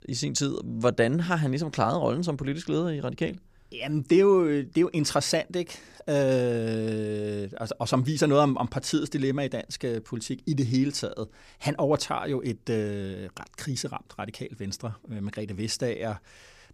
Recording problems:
none

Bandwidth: 15 kHz